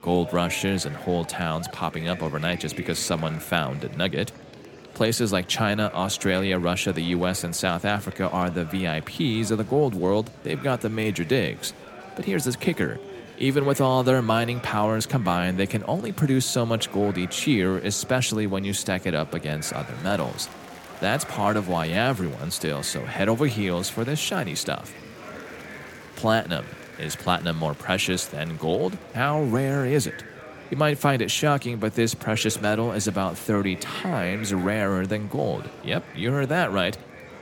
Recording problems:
murmuring crowd; noticeable; throughout; 15 dB below the speech

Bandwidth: 17.5 kHz